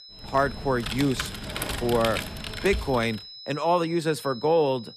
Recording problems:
high-pitched whine; noticeable; throughout; 5 kHz, 15 dB below the speech
keyboard typing; noticeable; until 3 s; peak 4 dB below the speech

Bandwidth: 14.5 kHz